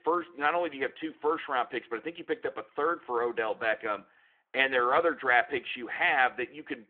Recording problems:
phone-call audio

